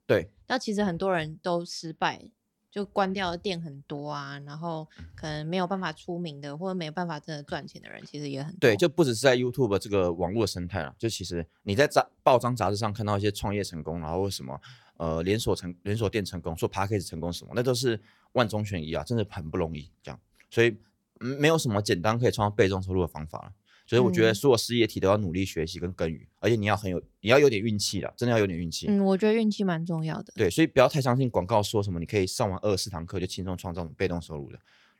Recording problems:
none

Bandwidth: 17 kHz